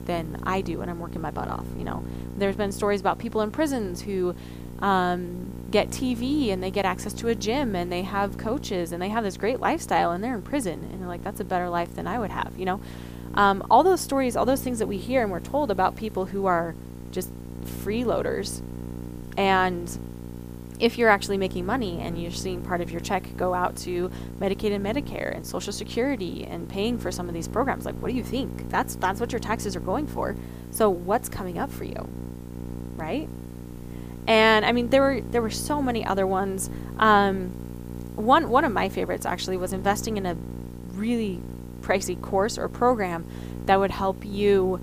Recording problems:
electrical hum; noticeable; throughout; 60 Hz, 20 dB below the speech
hiss; faint; throughout; 30 dB below the speech

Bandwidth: 15 kHz